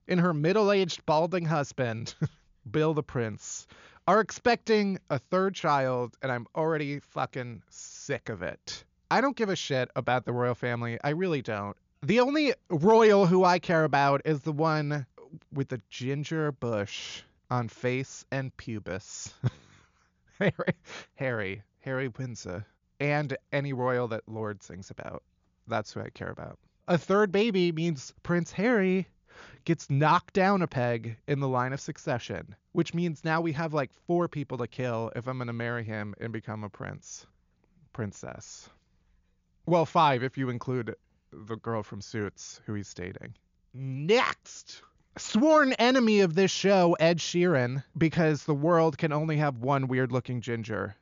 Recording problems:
high frequencies cut off; noticeable; nothing above 7 kHz

